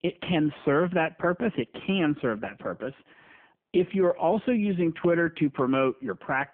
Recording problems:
phone-call audio; poor line

